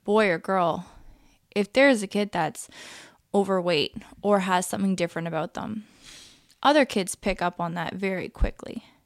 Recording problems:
none

